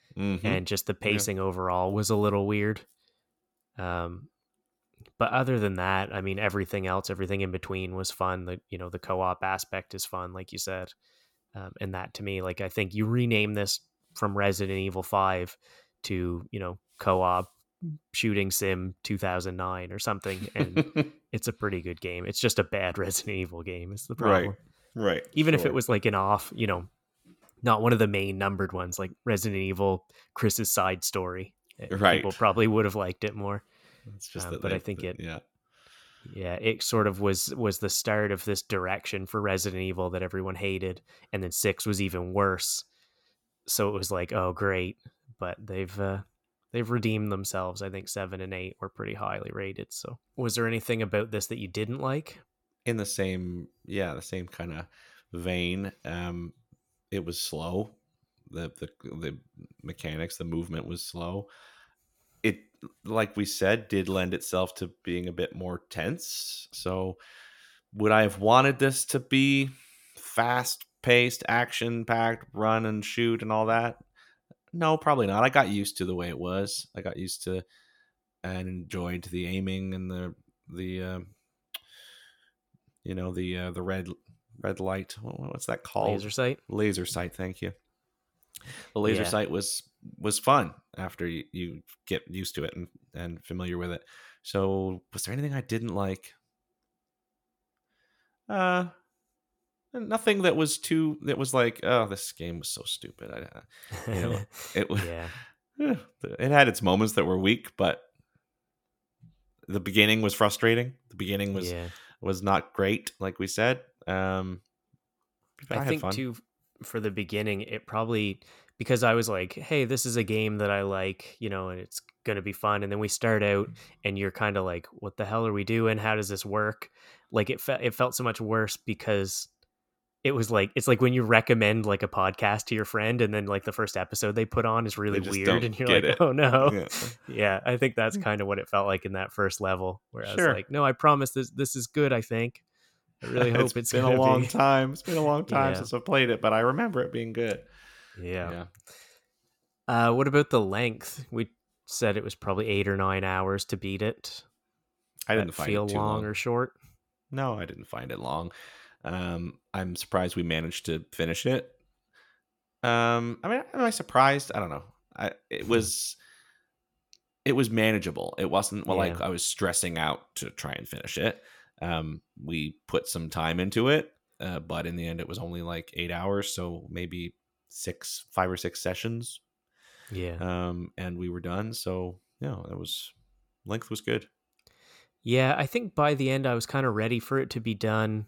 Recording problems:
none

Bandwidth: 18 kHz